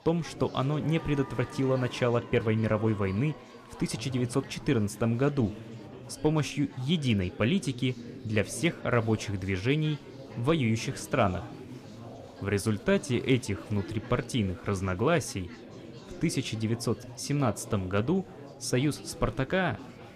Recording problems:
chatter from many people; noticeable; throughout; 15 dB below the speech

